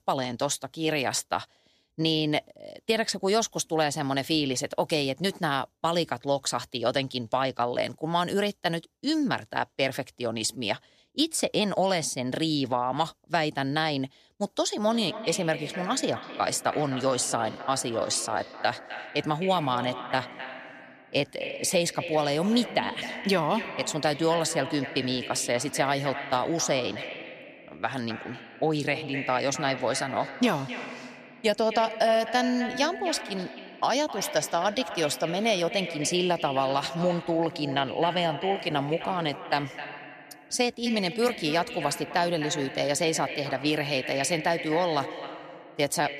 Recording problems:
echo of what is said; strong; from 15 s on; 260 ms later, 10 dB below the speech

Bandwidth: 14.5 kHz